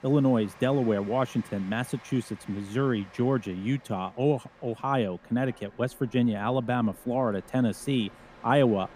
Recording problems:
train or aircraft noise; faint; throughout; 25 dB below the speech

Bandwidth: 15 kHz